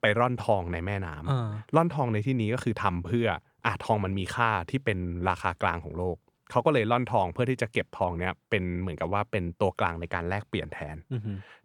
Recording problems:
none

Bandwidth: 18.5 kHz